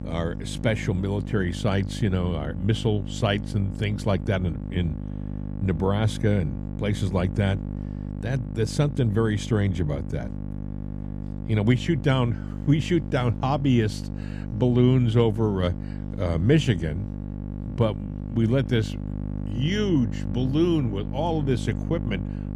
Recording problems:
electrical hum; noticeable; throughout; 50 Hz, 10 dB below the speech

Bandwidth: 14.5 kHz